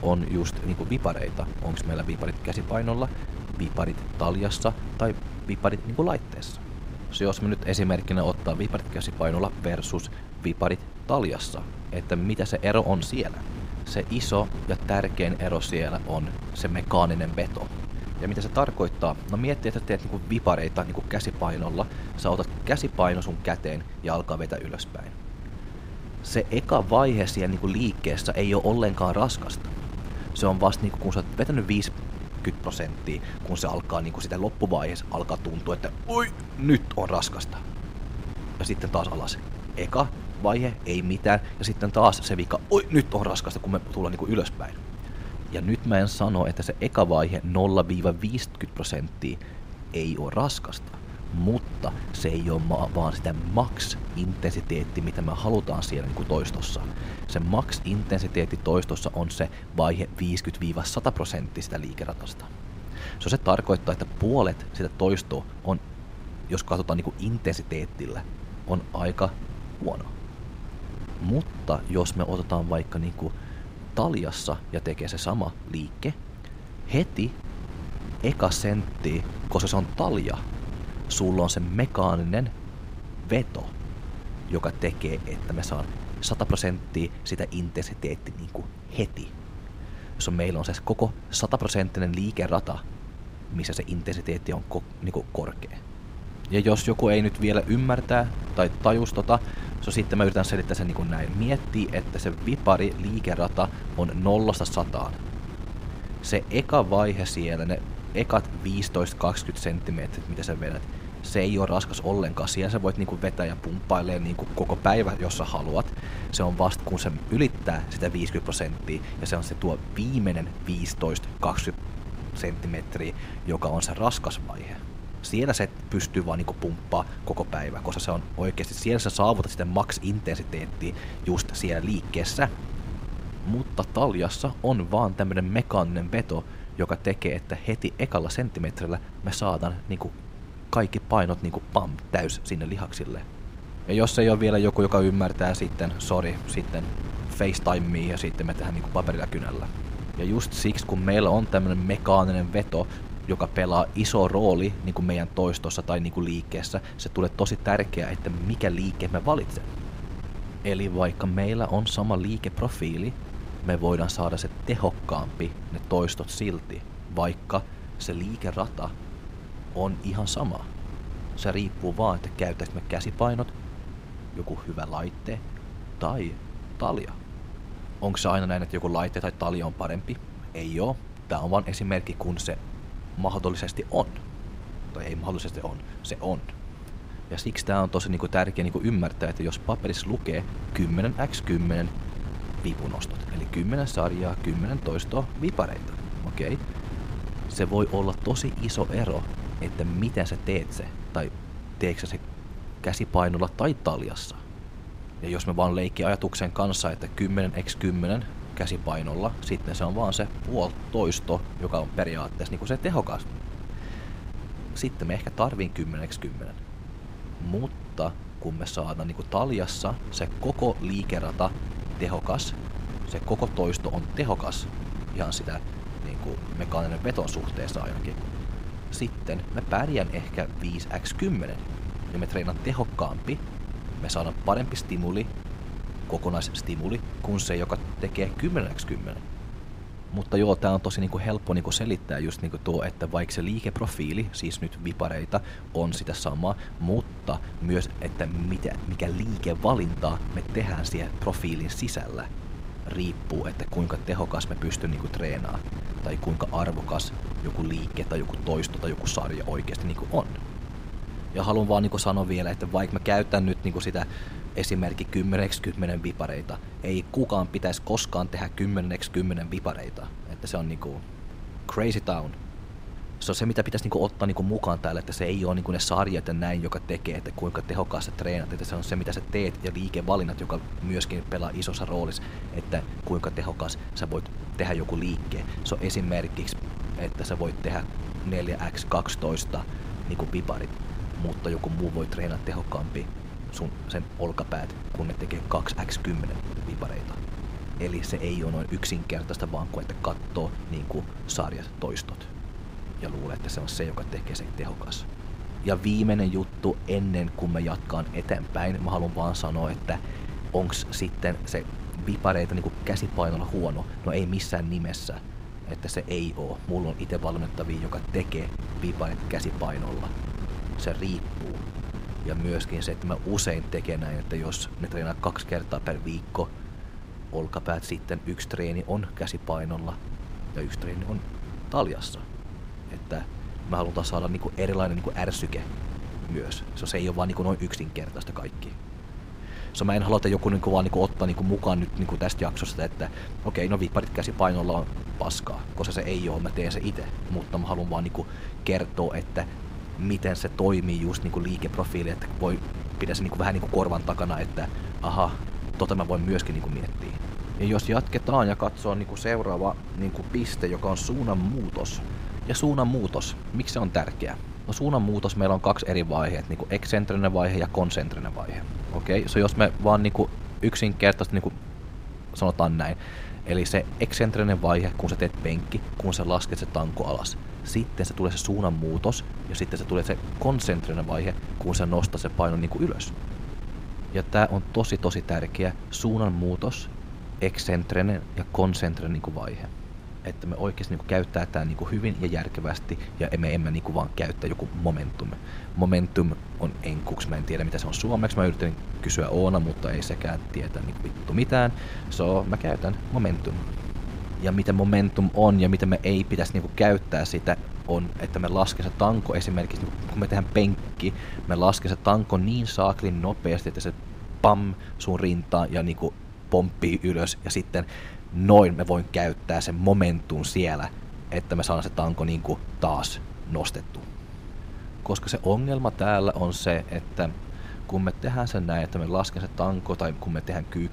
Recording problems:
wind noise on the microphone; occasional gusts; 15 dB below the speech

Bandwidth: 15.5 kHz